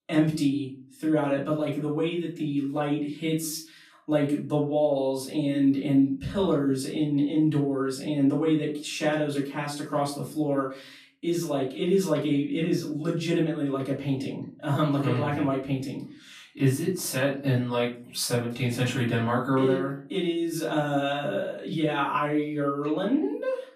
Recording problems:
off-mic speech; far
room echo; slight; dies away in 0.4 s

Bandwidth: 15 kHz